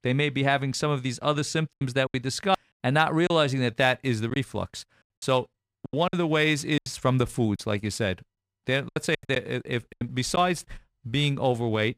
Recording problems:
choppy; very; 8% of the speech affected

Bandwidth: 15 kHz